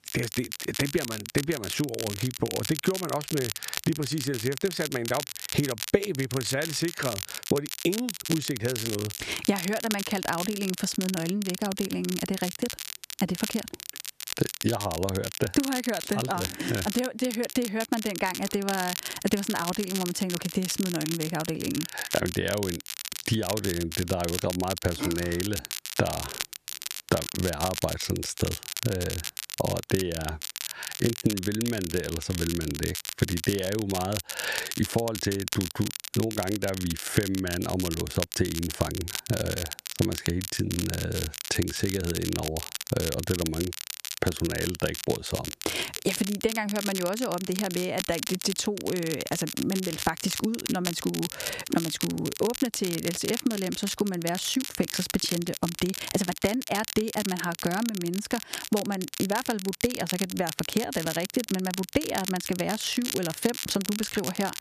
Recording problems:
squashed, flat; somewhat
crackle, like an old record; loud; 5 dB below the speech

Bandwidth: 14.5 kHz